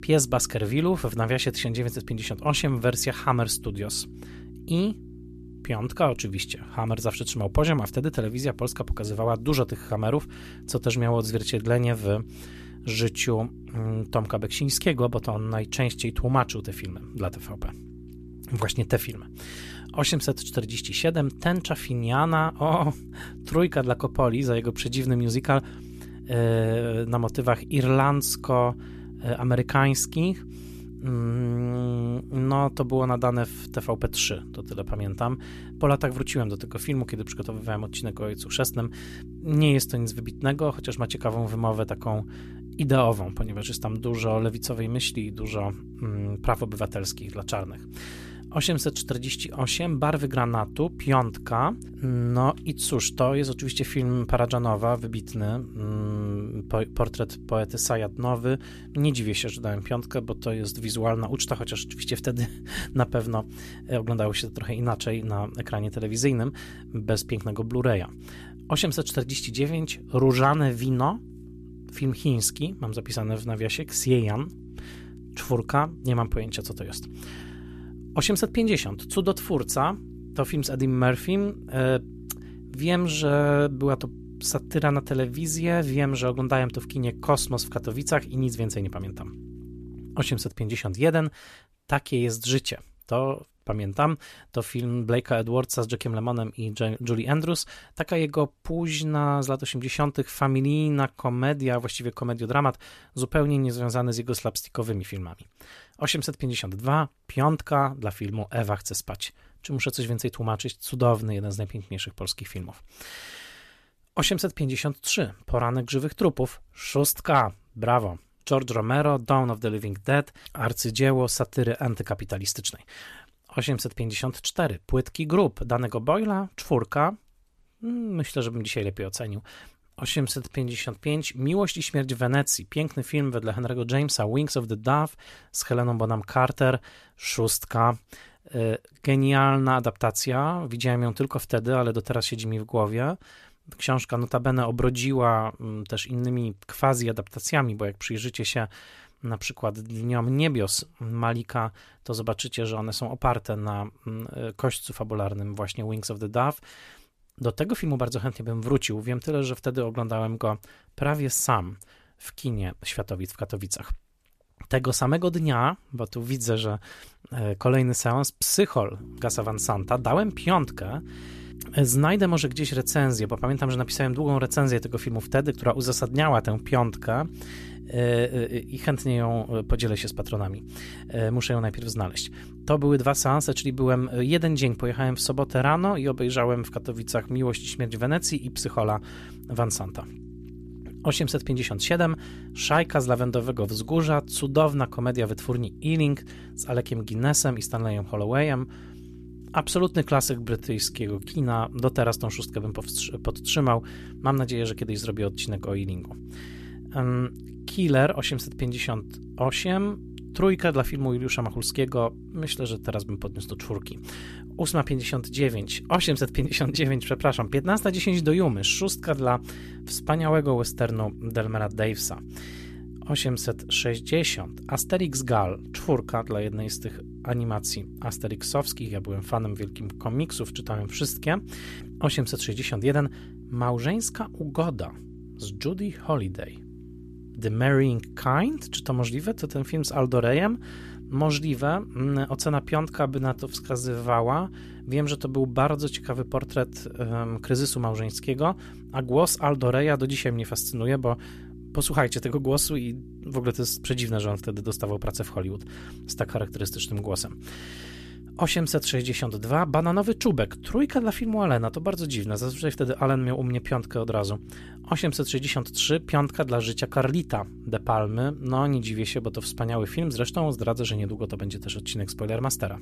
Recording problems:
electrical hum; faint; until 1:30 and from 2:49 on; 60 Hz, 20 dB below the speech
uneven, jittery; strongly; from 2:10 to 4:04

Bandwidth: 14.5 kHz